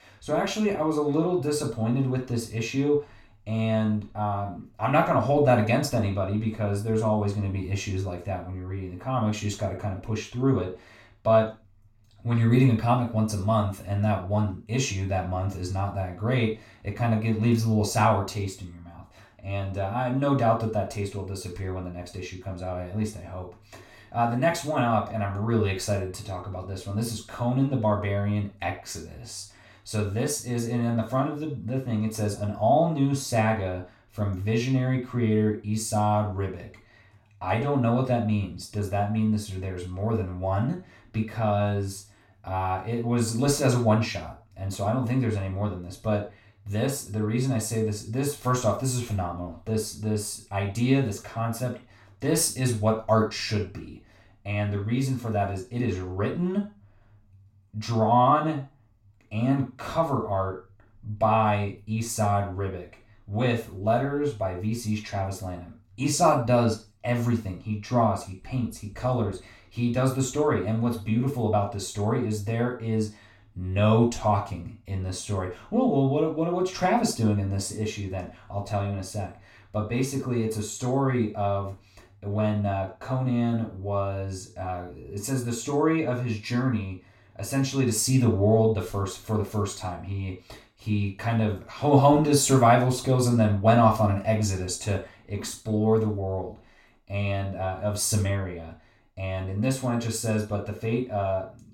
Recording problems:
off-mic speech; far
room echo; slight; dies away in 0.3 s

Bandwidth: 16.5 kHz